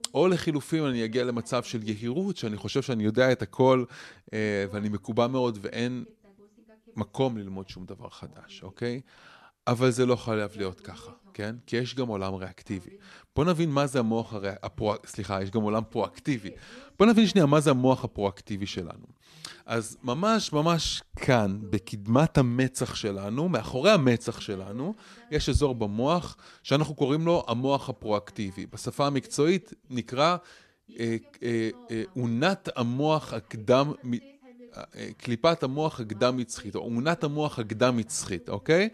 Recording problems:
voice in the background; faint; throughout; 30 dB below the speech

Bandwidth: 13.5 kHz